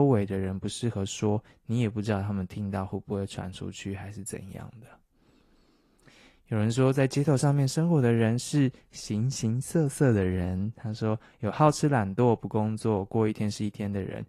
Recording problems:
garbled, watery; slightly
abrupt cut into speech; at the start

